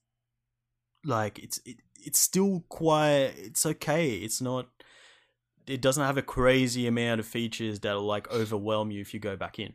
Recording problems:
none

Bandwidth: 15 kHz